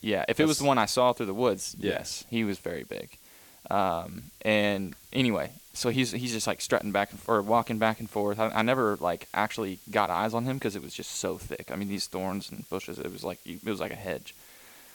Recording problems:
hiss; faint; throughout; 20 dB below the speech

